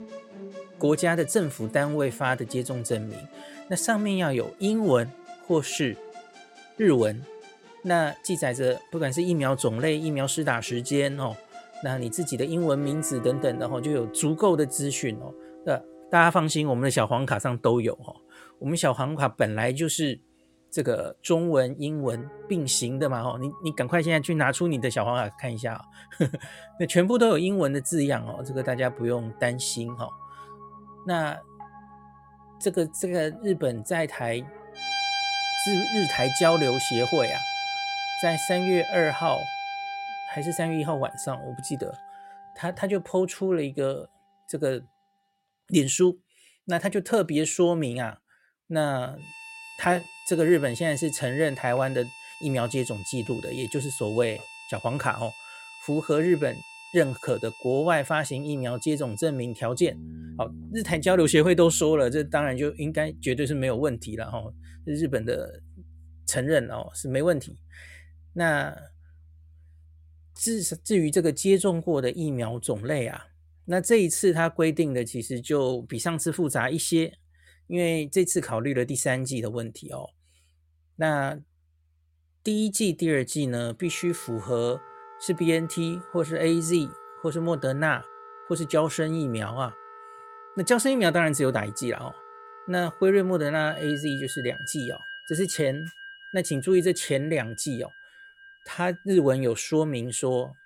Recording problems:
background music; noticeable; throughout; 10 dB below the speech

